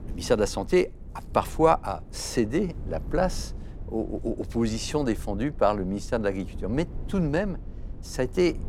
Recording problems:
low rumble; faint; throughout; 25 dB below the speech

